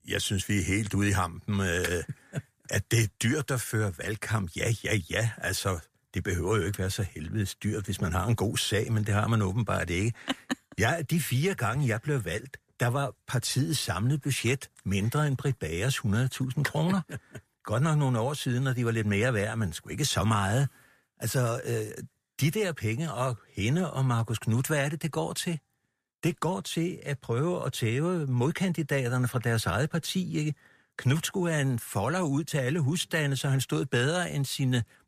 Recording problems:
none

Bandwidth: 14.5 kHz